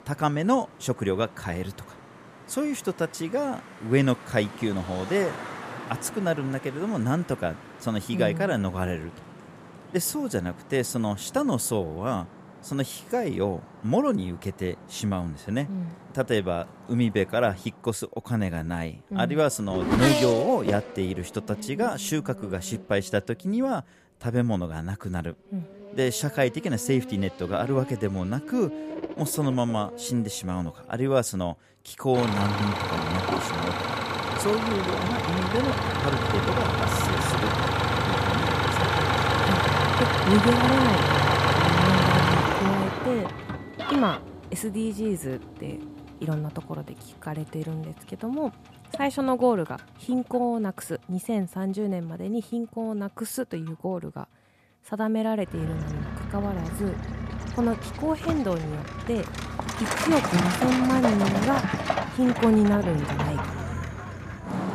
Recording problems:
traffic noise; very loud; throughout; 1 dB above the speech

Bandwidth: 14.5 kHz